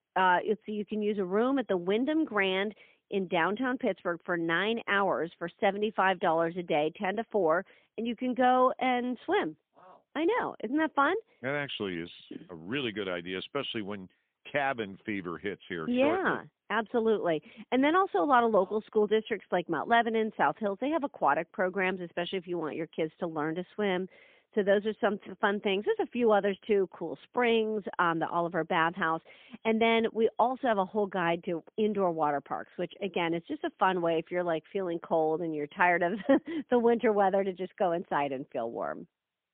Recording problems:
phone-call audio; poor line; nothing above 3.5 kHz

